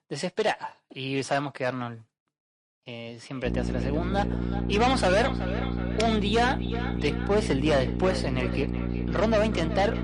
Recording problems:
distortion; heavy; 6% of the sound clipped
echo of what is said; strong; from 3.5 s on; 370 ms later, 10 dB below the speech
garbled, watery; slightly; nothing above 10.5 kHz
electrical hum; noticeable; from 3.5 s on; 60 Hz, 10 dB below the speech

